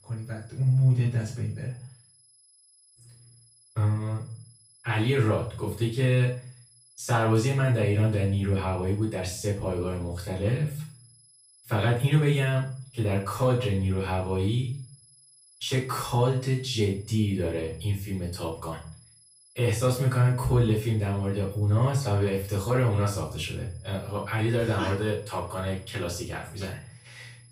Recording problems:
off-mic speech; far
room echo; noticeable; dies away in 0.4 s
high-pitched whine; faint; throughout; 11 kHz, 25 dB below the speech

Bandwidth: 15 kHz